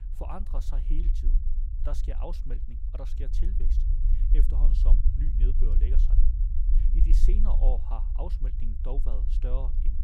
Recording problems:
low rumble; loud; throughout; 6 dB below the speech

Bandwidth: 16 kHz